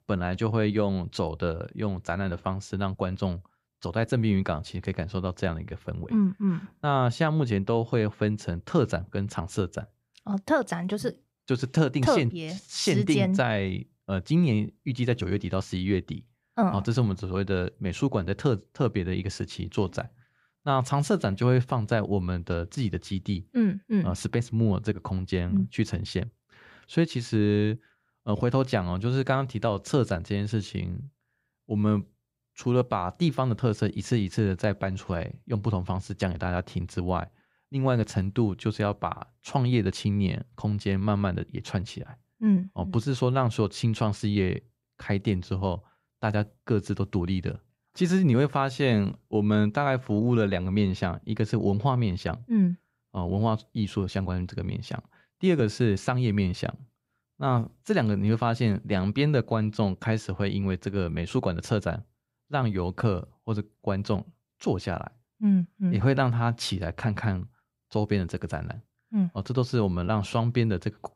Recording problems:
none

